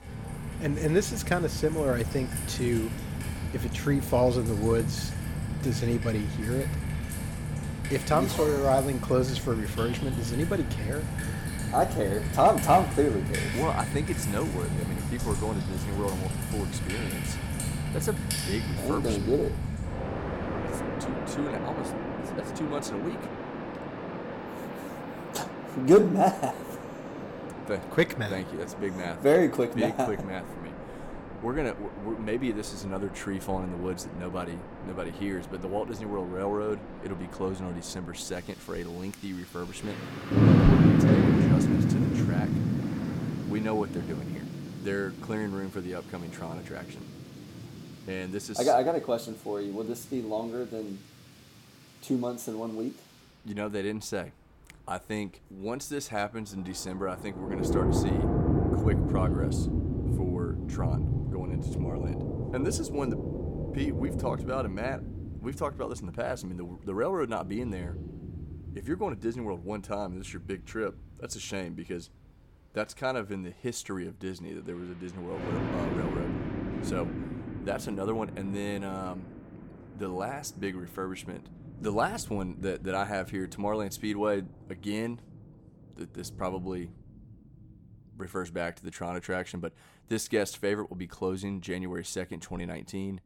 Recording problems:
rain or running water; loud; throughout; as loud as the speech

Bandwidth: 17 kHz